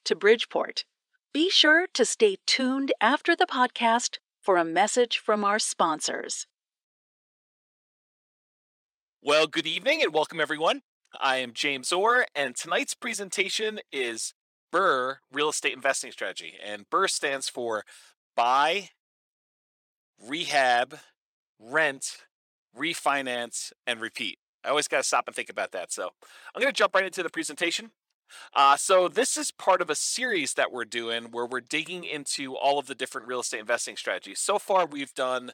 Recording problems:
thin; somewhat; fading below 400 Hz

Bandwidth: 17 kHz